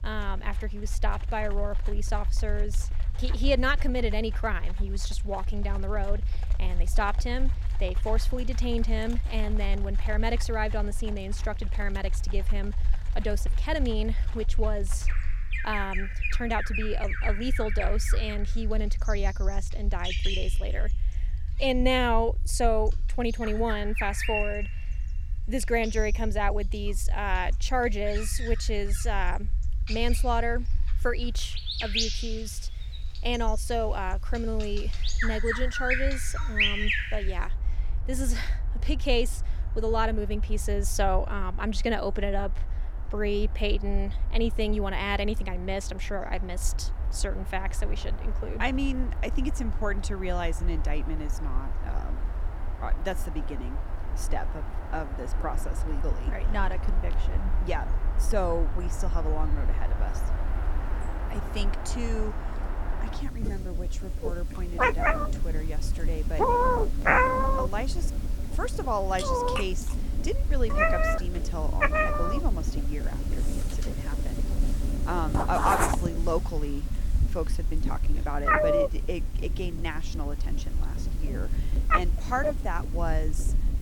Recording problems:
animal sounds; very loud; throughout; 1 dB above the speech
low rumble; faint; throughout; 25 dB below the speech

